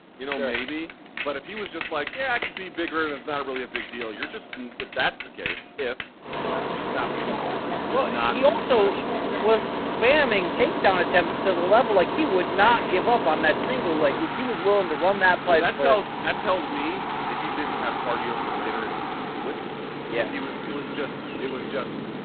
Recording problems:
phone-call audio; poor line; nothing above 4 kHz
traffic noise; loud; throughout; 5 dB below the speech

